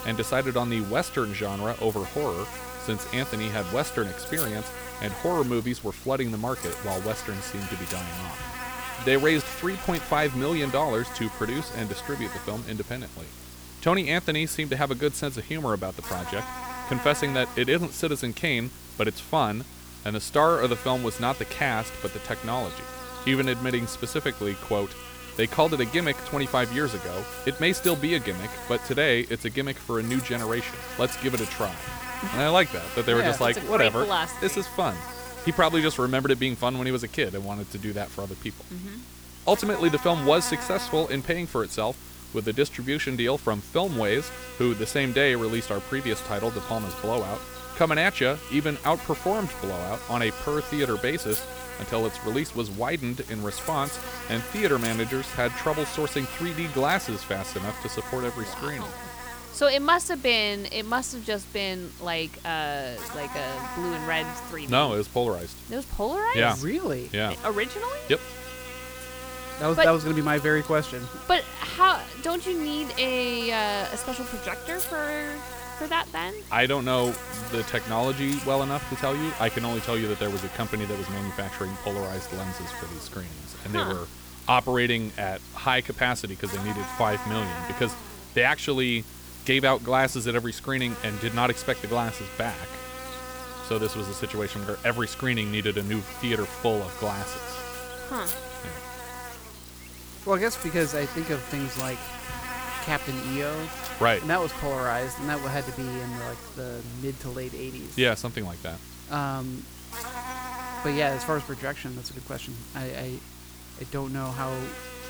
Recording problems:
electrical hum; noticeable; throughout; 60 Hz, 10 dB below the speech

